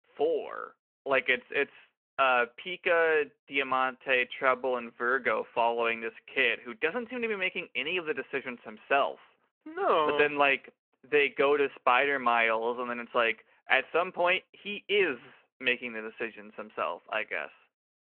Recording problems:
phone-call audio

